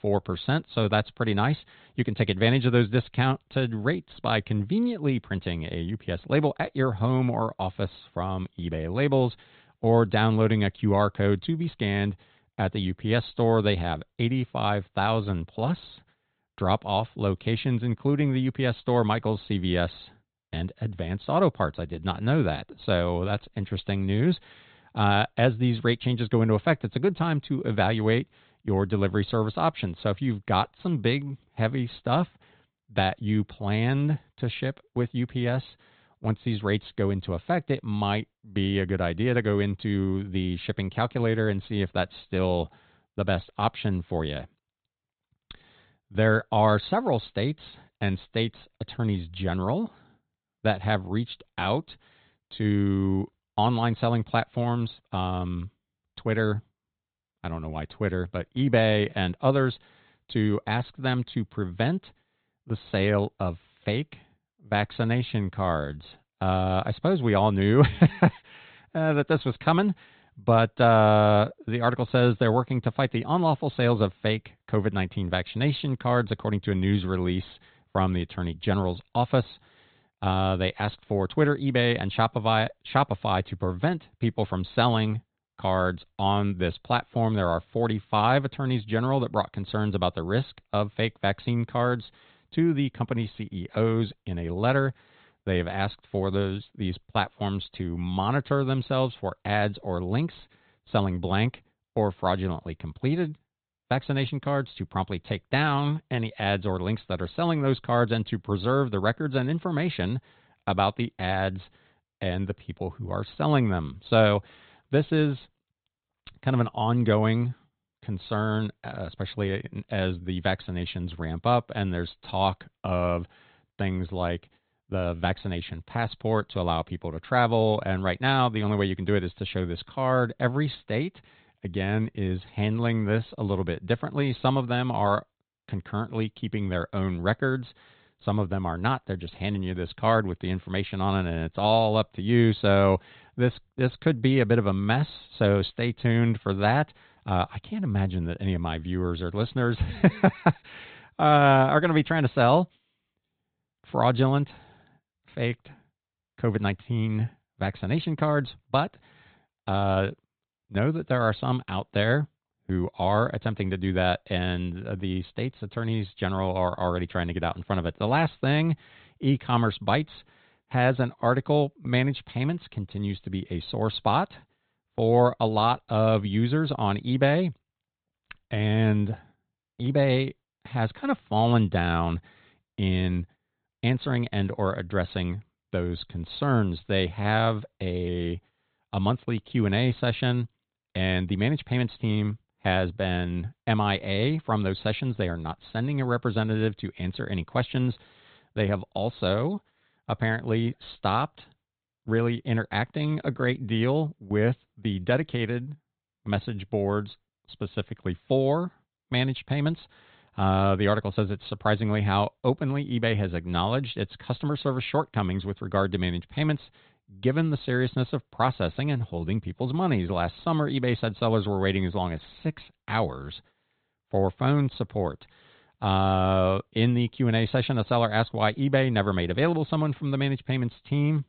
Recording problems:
high frequencies cut off; severe; nothing above 4 kHz

